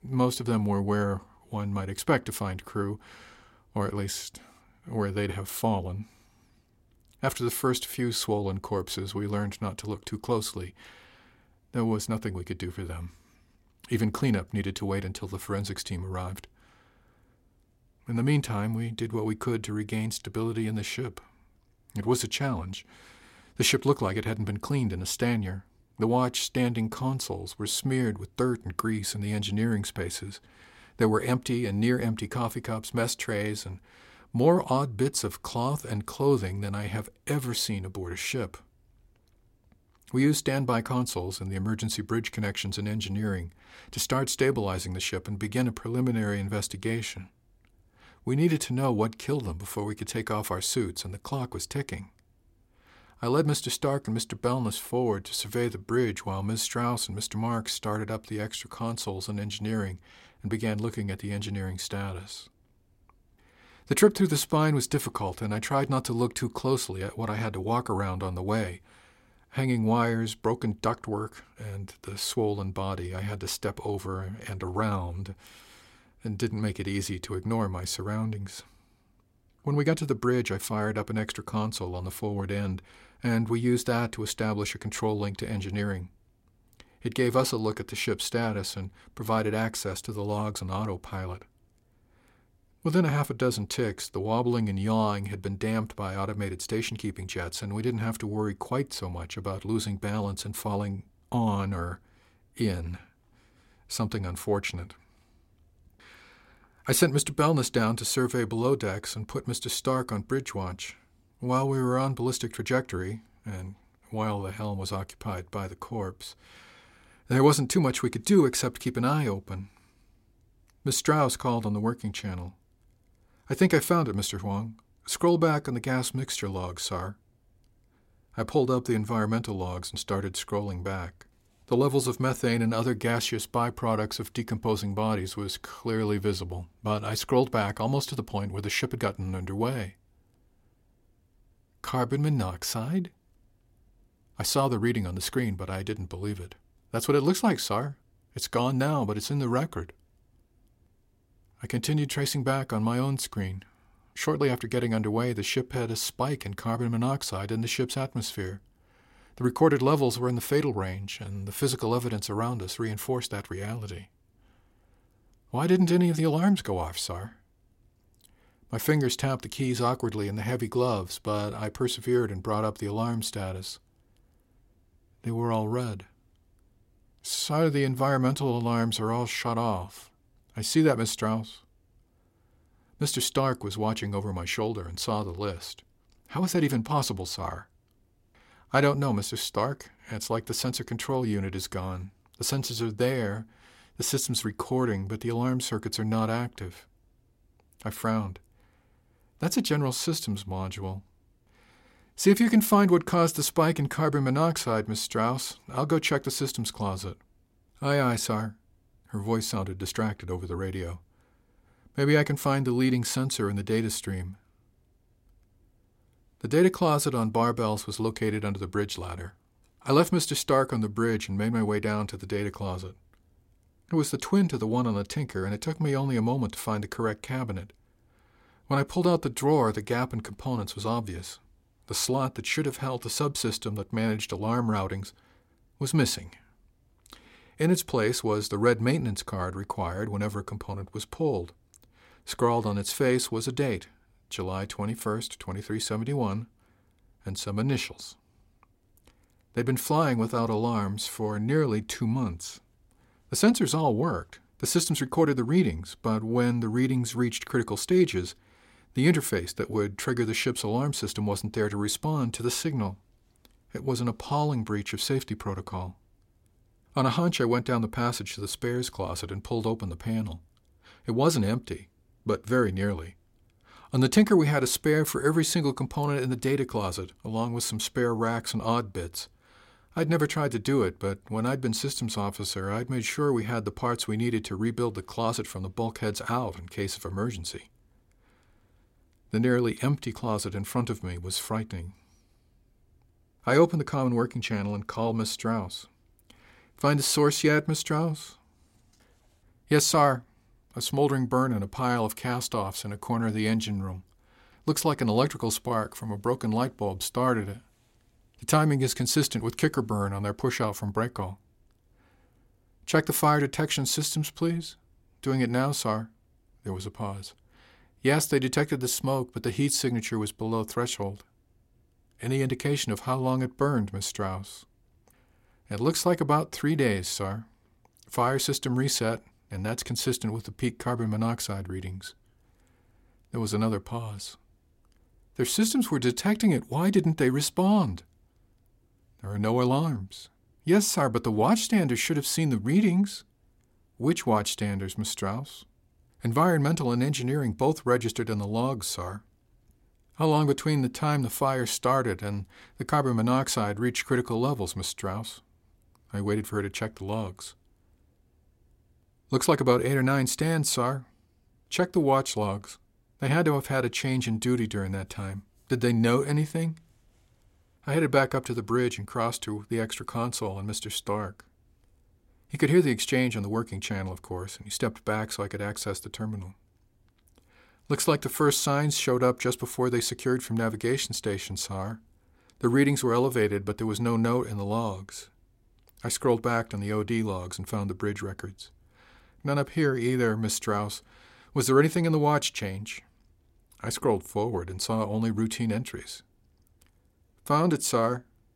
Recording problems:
none

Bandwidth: 16 kHz